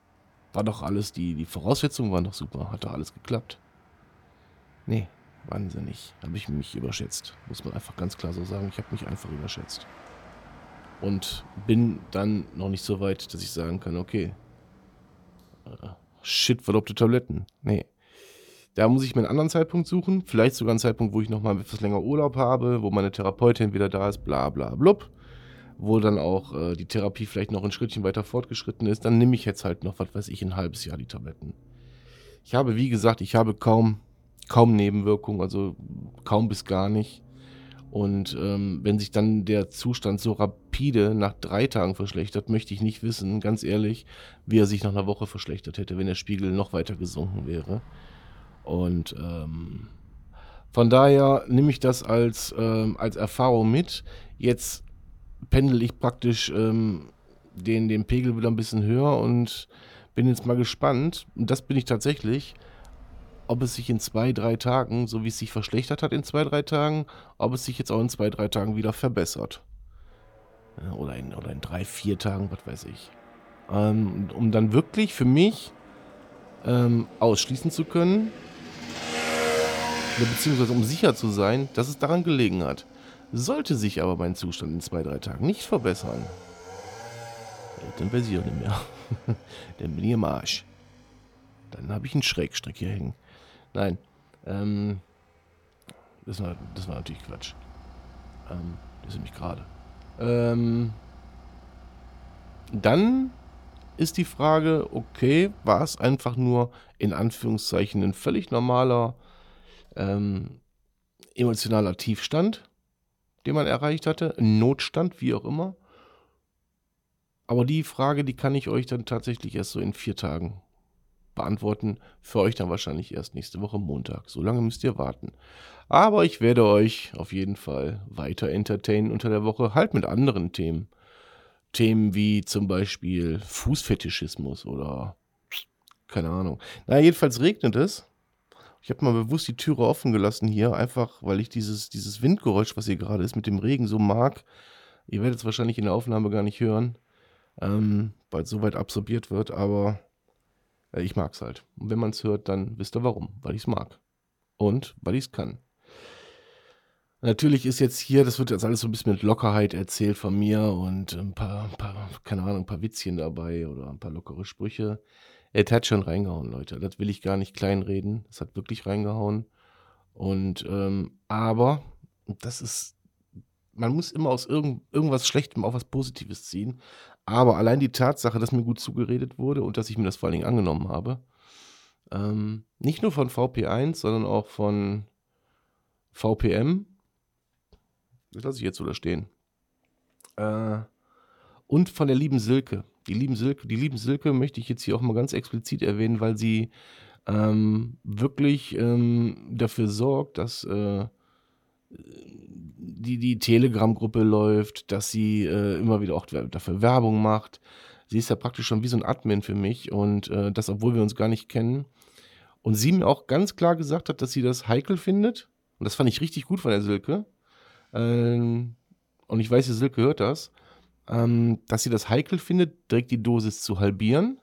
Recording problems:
traffic noise; noticeable; throughout; 15 dB below the speech

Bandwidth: 18 kHz